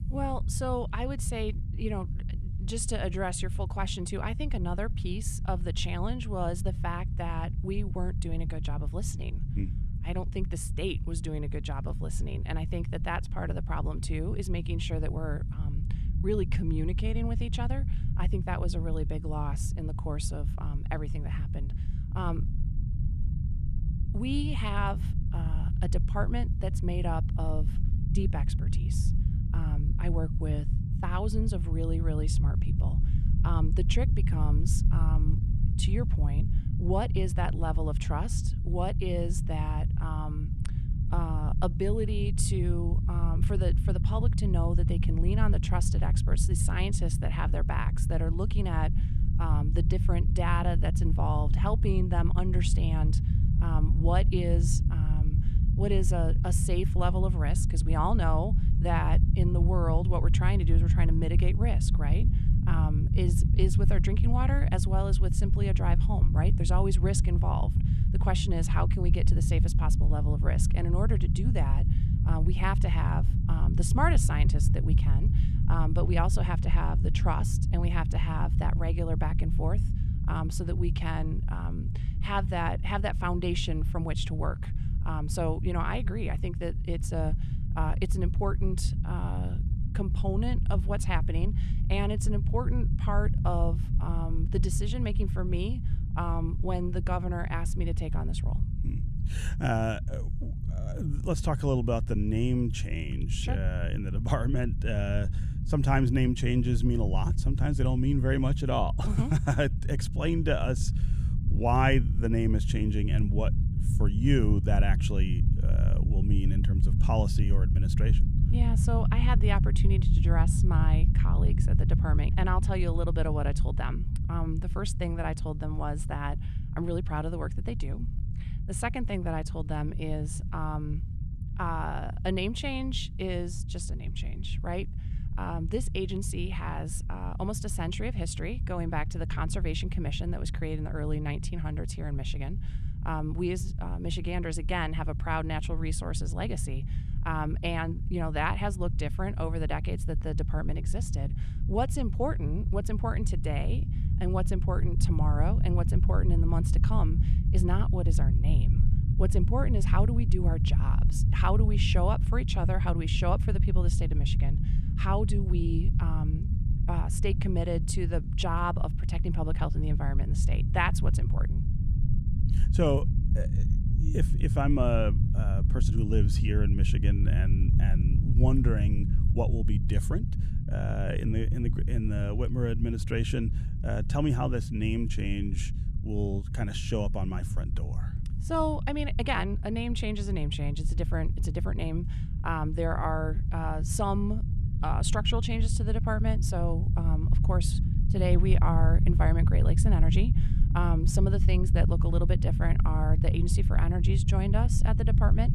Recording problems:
low rumble; loud; throughout; 9 dB below the speech

